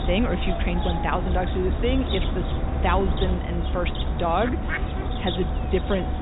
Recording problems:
high frequencies cut off; severe; nothing above 4 kHz
animal sounds; loud; throughout; as loud as the speech
electrical hum; noticeable; from 1.5 s on; 50 Hz, 20 dB below the speech

